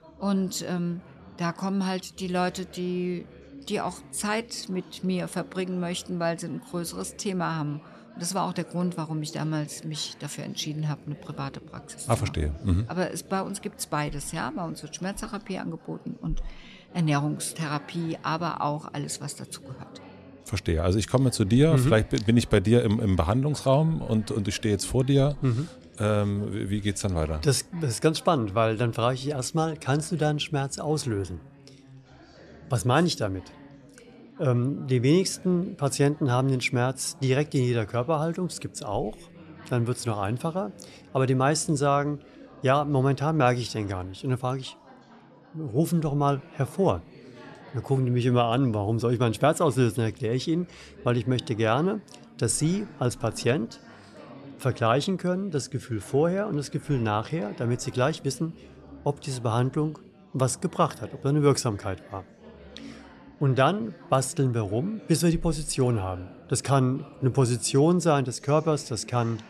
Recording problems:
chatter from many people; faint; throughout; 20 dB below the speech

